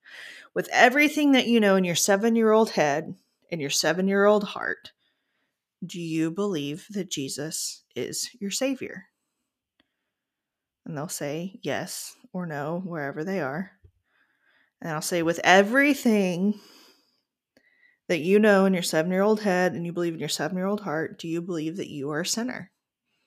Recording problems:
none

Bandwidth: 14.5 kHz